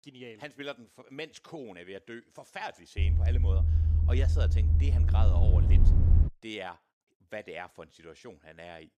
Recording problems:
low rumble; loud; from 3 to 6.5 s; 1 dB below the speech

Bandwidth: 15 kHz